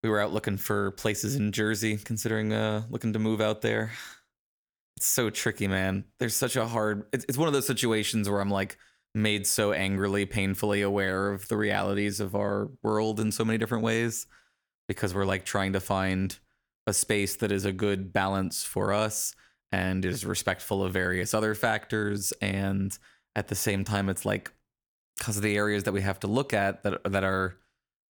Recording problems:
none

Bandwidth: 18.5 kHz